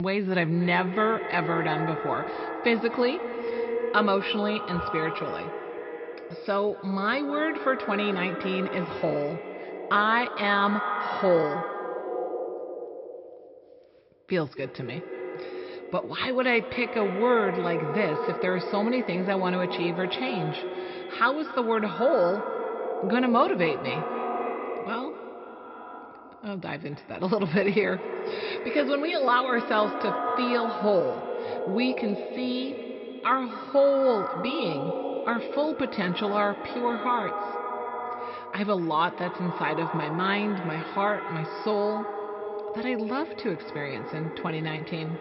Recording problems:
echo of what is said; strong; throughout; 240 ms later, 6 dB below the speech
high frequencies cut off; noticeable; nothing above 5.5 kHz
abrupt cut into speech; at the start

